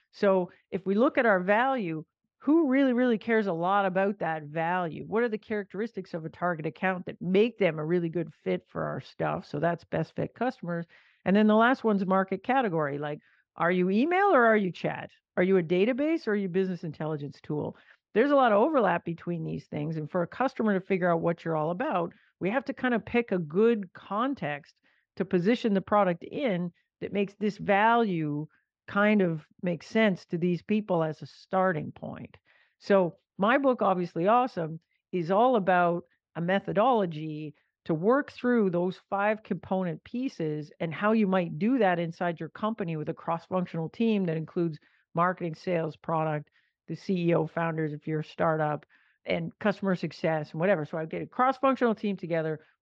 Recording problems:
muffled; slightly; fading above 3.5 kHz

